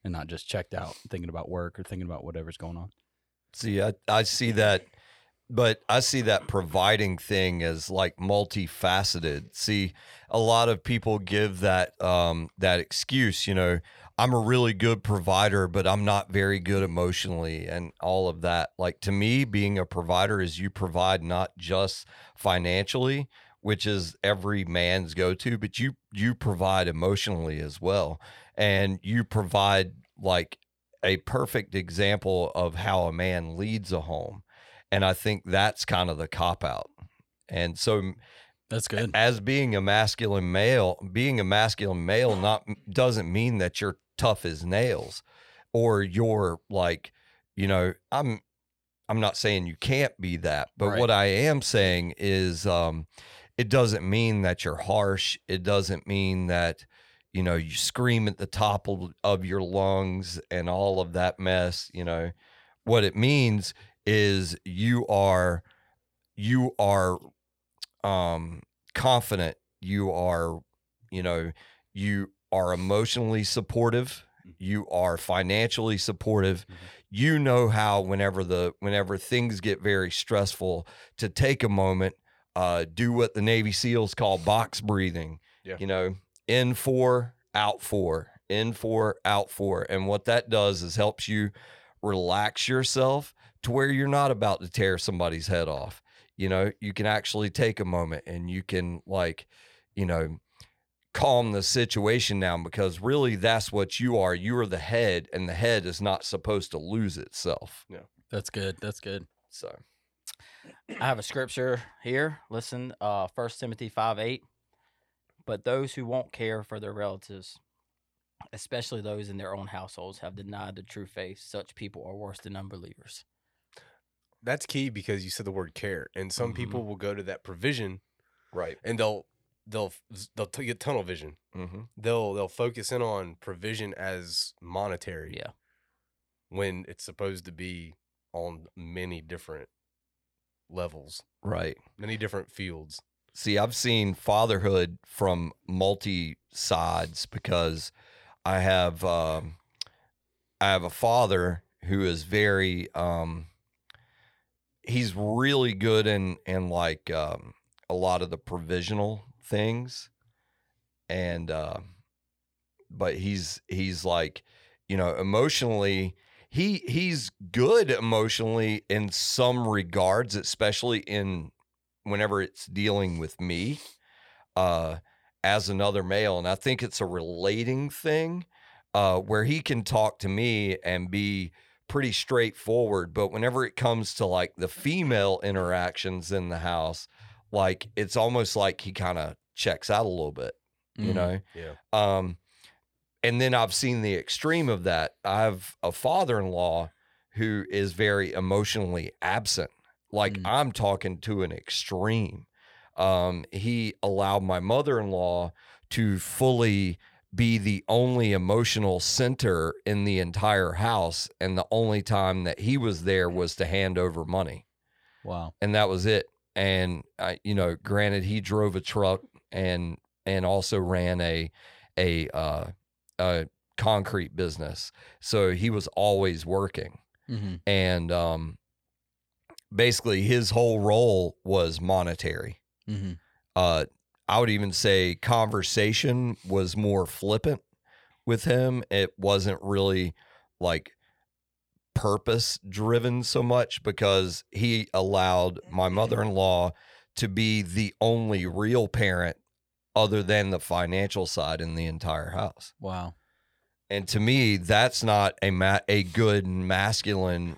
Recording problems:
none

